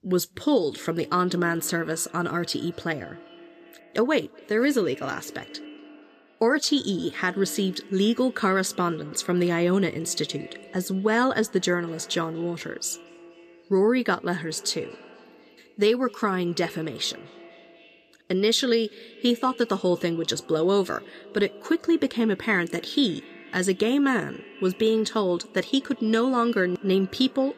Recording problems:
echo of what is said; faint; throughout; 240 ms later, 20 dB below the speech

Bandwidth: 14.5 kHz